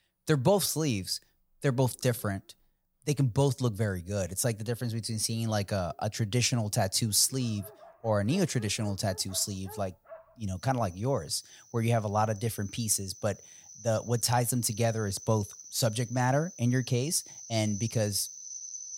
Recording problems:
animal sounds; noticeable; throughout; 15 dB below the speech

